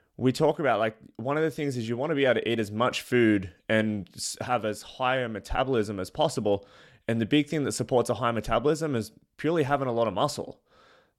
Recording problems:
none

